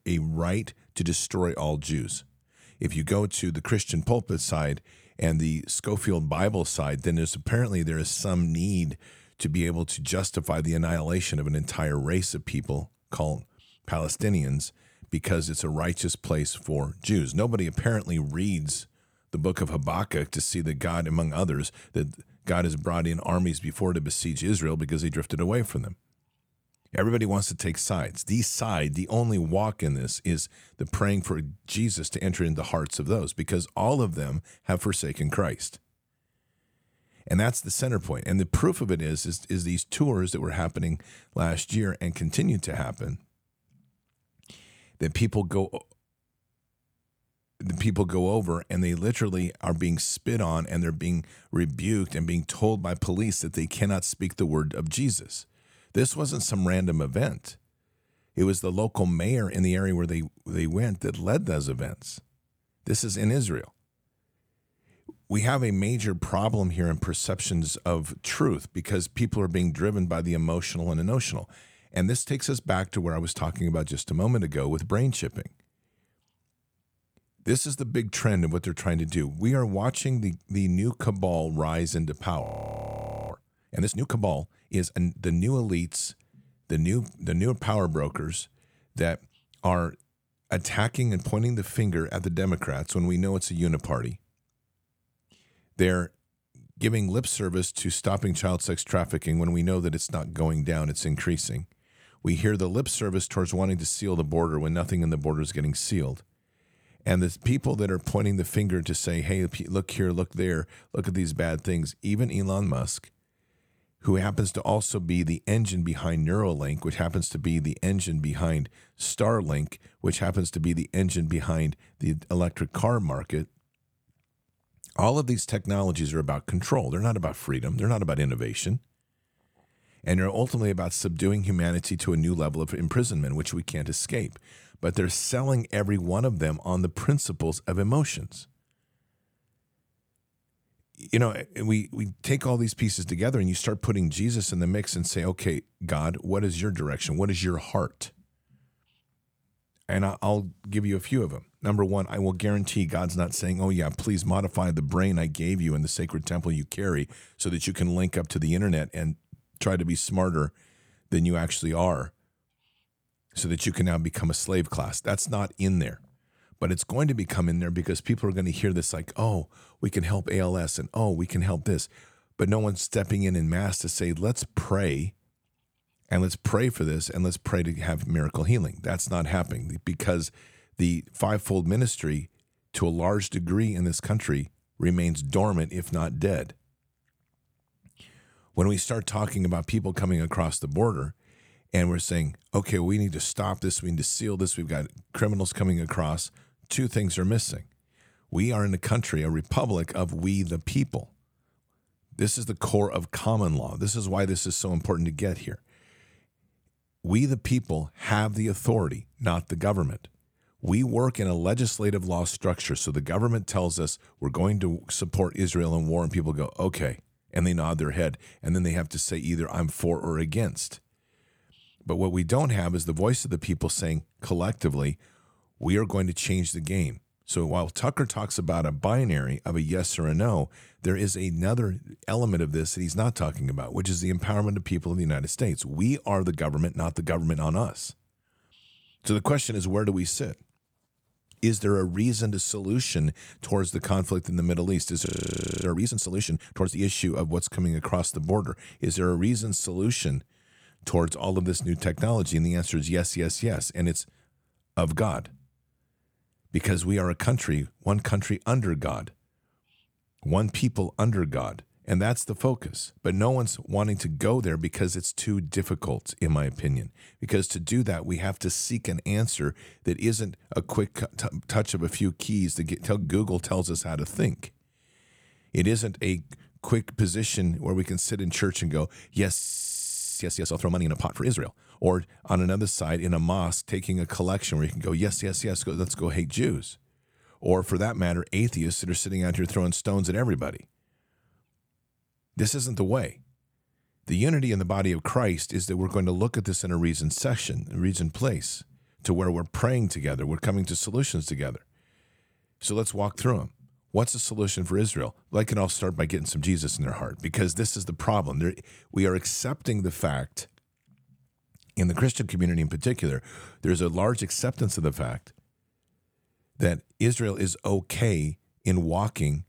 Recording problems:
audio freezing; at 1:22 for 1 s, at 4:05 for 0.5 s and at 4:39 for 1 s

